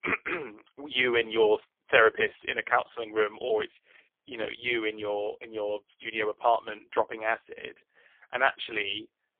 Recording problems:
phone-call audio; poor line; nothing above 3.5 kHz

